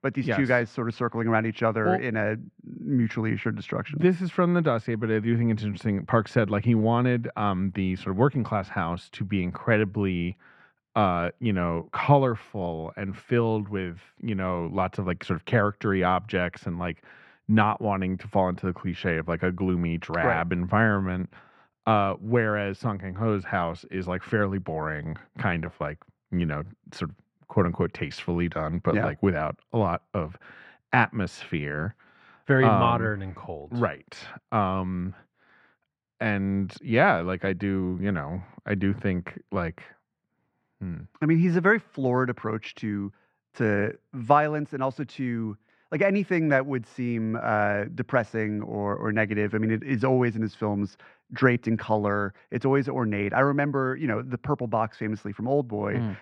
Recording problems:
muffled; very; fading above 2 kHz

